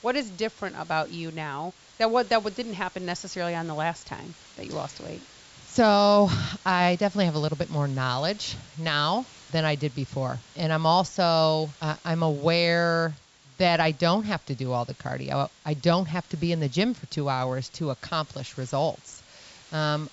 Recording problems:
high frequencies cut off; noticeable; nothing above 8 kHz
hiss; faint; throughout; 25 dB below the speech

